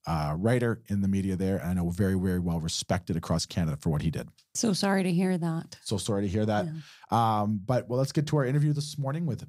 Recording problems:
none

